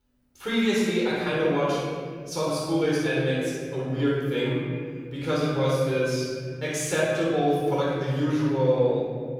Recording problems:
room echo; strong; dies away in 2.2 s
off-mic speech; far

